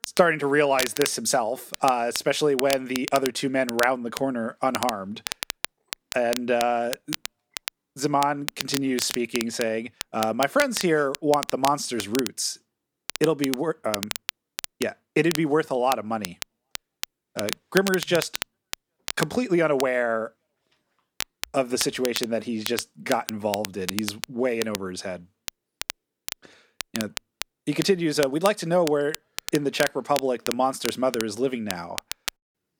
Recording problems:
crackle, like an old record; loud; 9 dB below the speech

